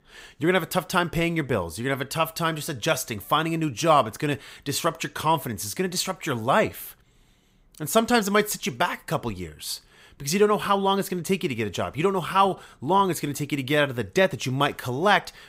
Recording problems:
none

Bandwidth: 15.5 kHz